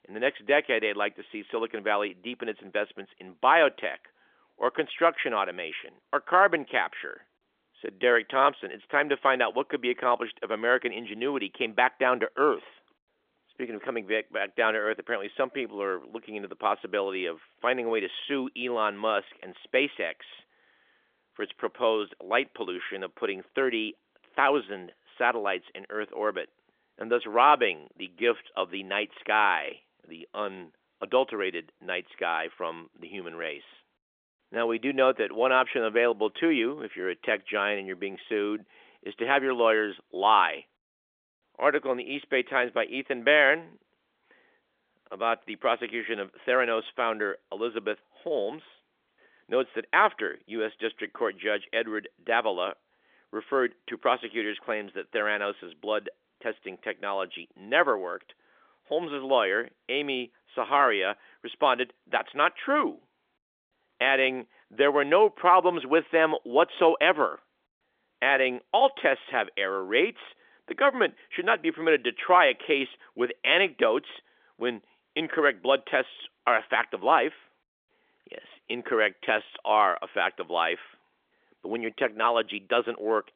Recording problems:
phone-call audio; nothing above 3.5 kHz

